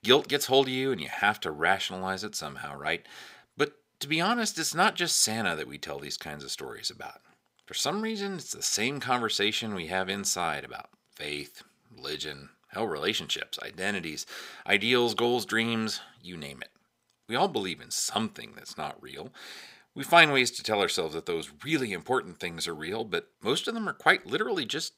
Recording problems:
thin; somewhat; fading below 1 kHz

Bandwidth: 15.5 kHz